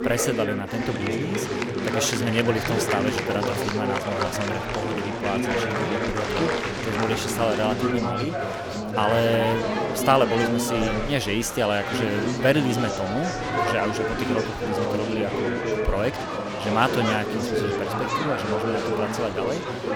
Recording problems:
chatter from many people; very loud; throughout; as loud as the speech

